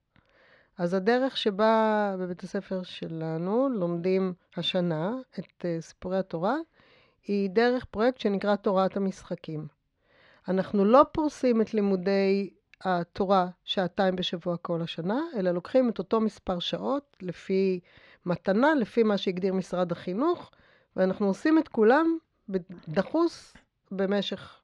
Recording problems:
muffled; very slightly; fading above 3 kHz

